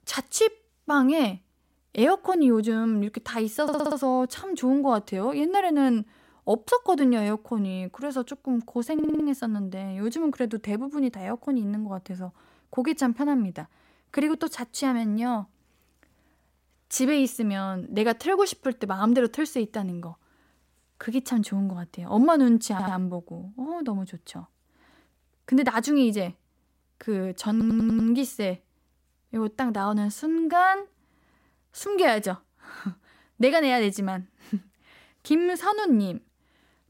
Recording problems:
audio stuttering; 4 times, first at 3.5 s

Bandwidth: 16 kHz